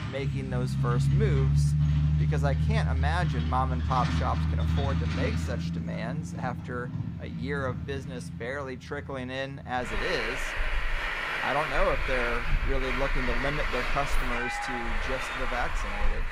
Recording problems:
traffic noise; very loud; throughout; 4 dB above the speech

